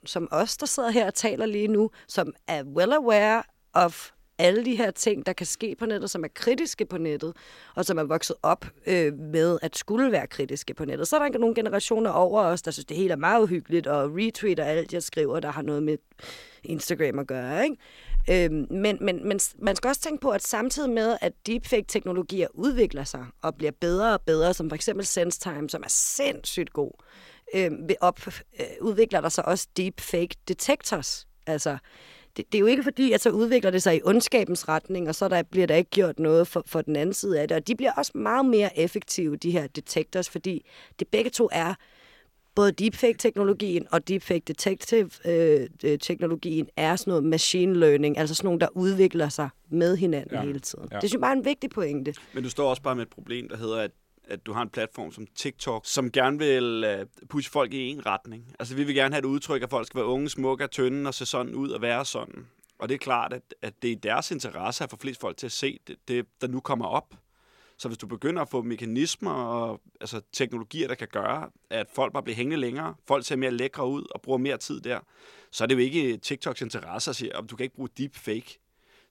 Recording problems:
none

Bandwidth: 16.5 kHz